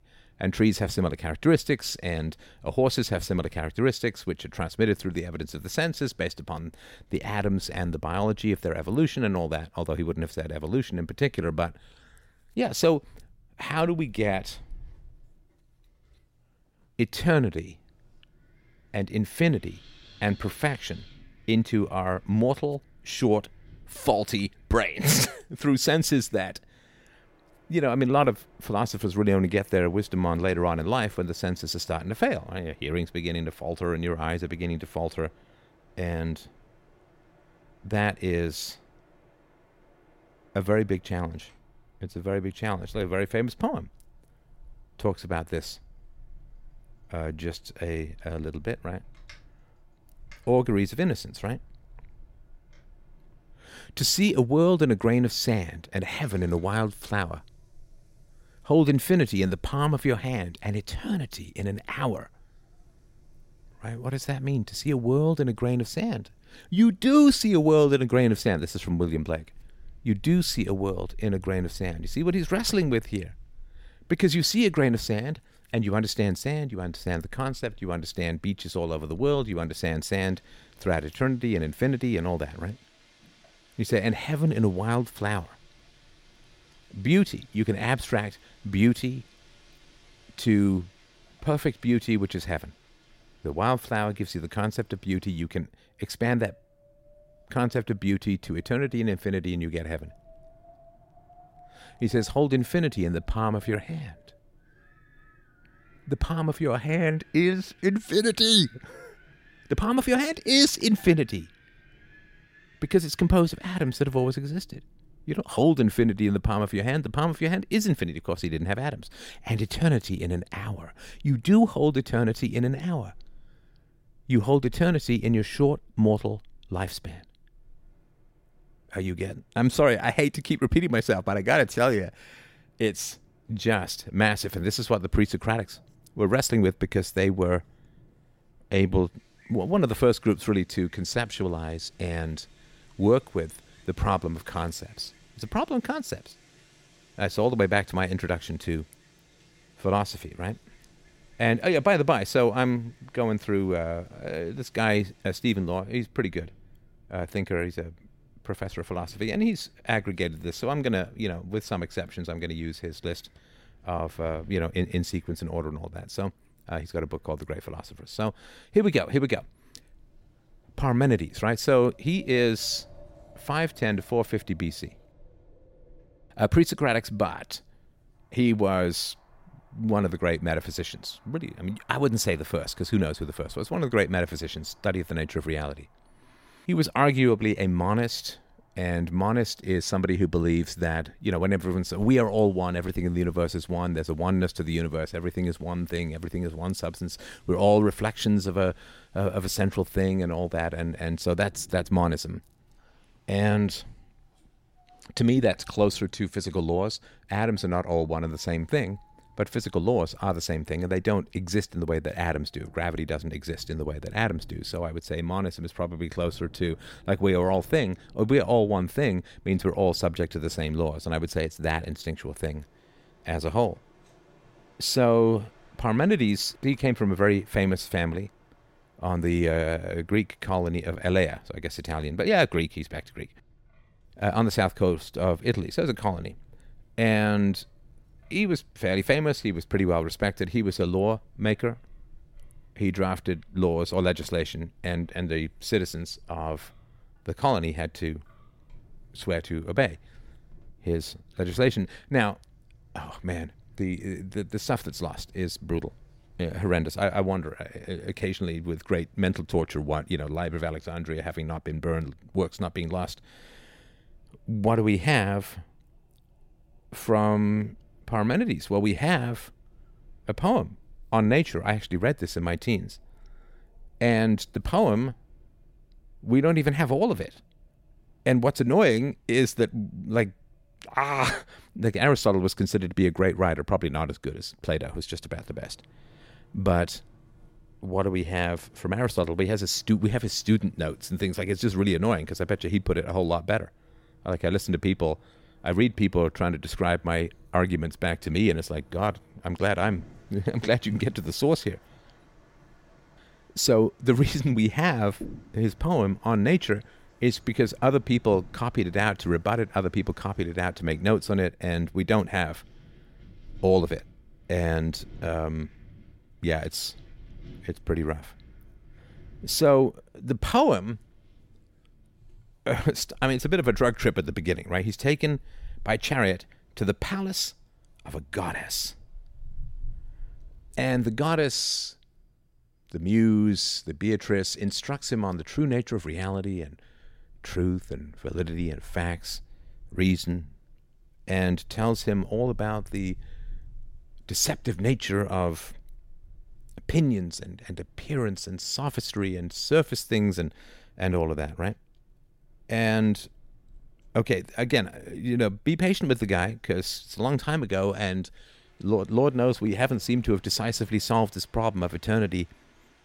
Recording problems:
wind in the background; faint; throughout; 30 dB below the speech

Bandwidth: 16 kHz